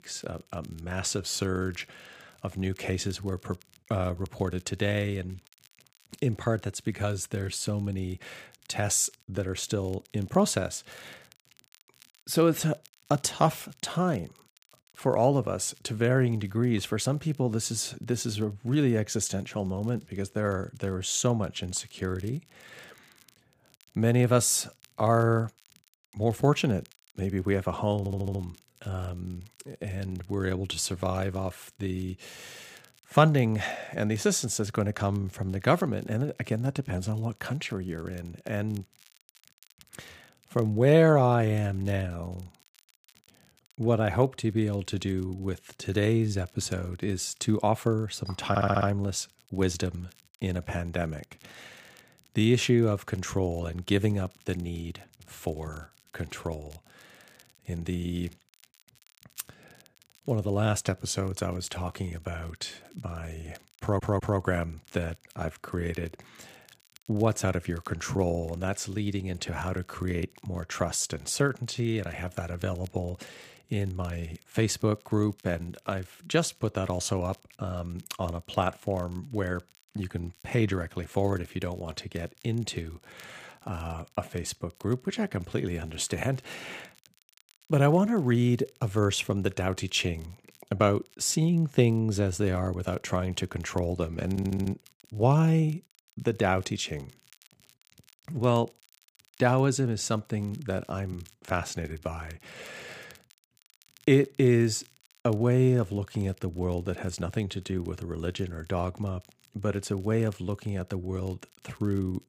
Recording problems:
crackle, like an old record; faint; 30 dB below the speech
audio stuttering; 4 times, first at 28 s

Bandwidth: 15 kHz